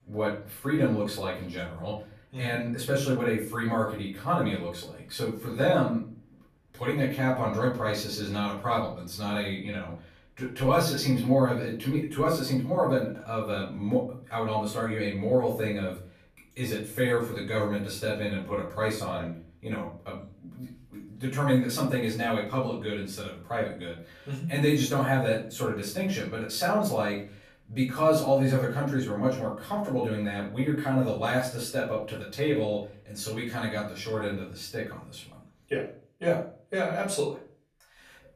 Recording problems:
off-mic speech; far
room echo; slight; dies away in 0.4 s

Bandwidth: 14.5 kHz